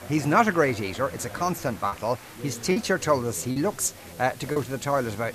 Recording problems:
chatter from many people; noticeable; throughout; 15 dB below the speech
hiss; faint; throughout; 20 dB below the speech
choppy; occasionally; 4% of the speech affected

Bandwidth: 14.5 kHz